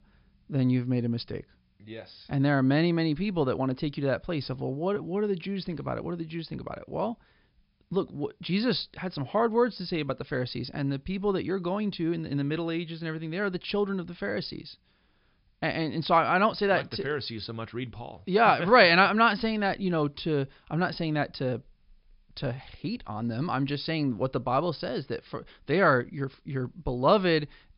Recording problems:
high frequencies cut off; noticeable; nothing above 5.5 kHz

